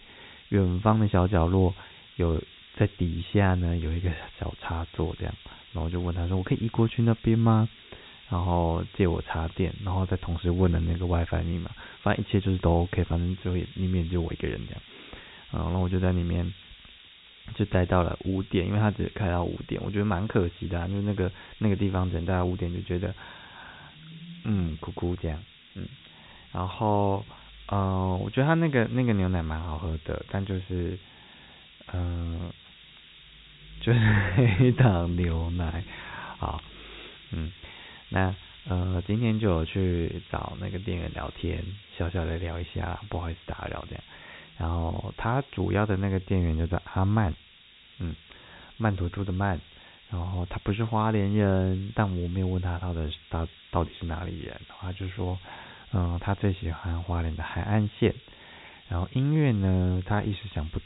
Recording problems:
high frequencies cut off; severe; nothing above 4 kHz
hiss; faint; throughout; 20 dB below the speech

